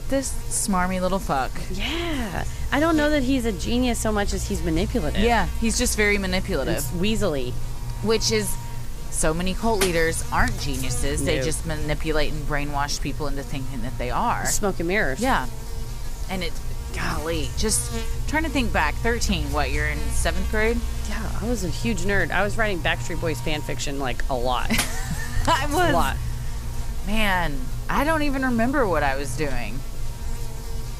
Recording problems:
electrical hum; very faint; throughout; 60 Hz, 15 dB below the speech

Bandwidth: 15 kHz